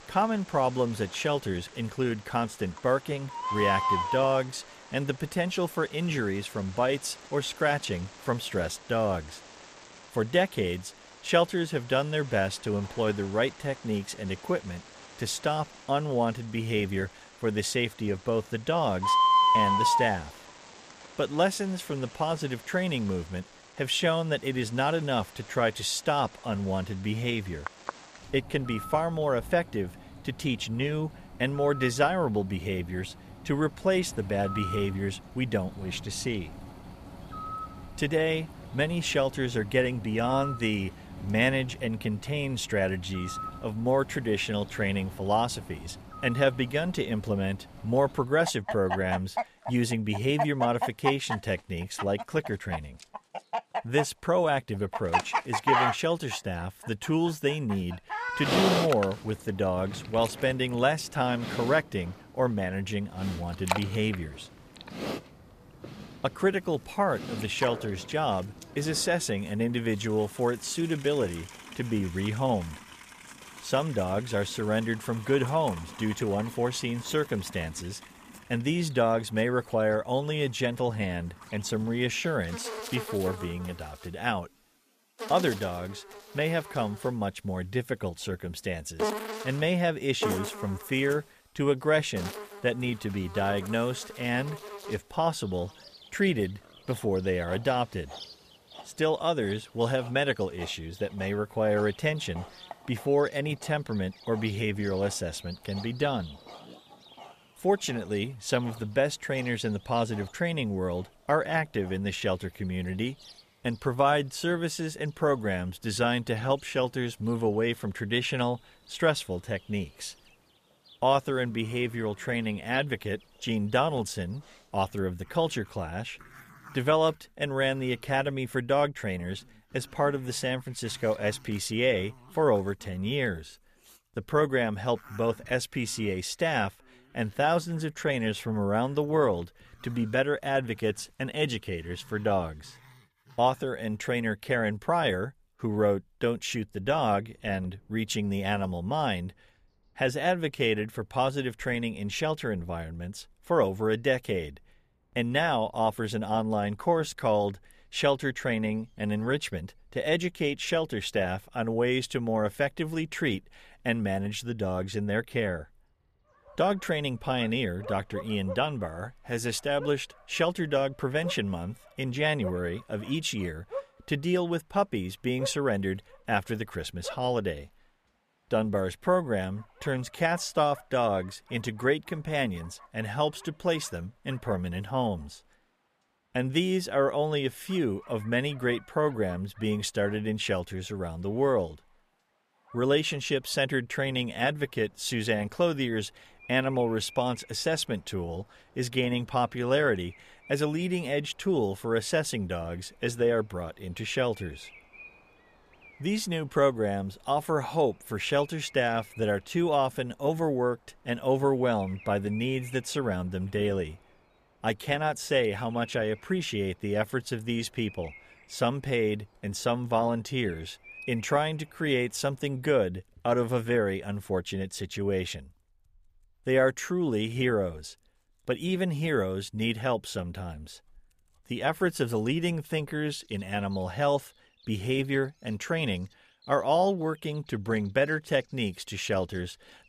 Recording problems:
animal sounds; loud; throughout; 8 dB below the speech

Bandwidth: 14.5 kHz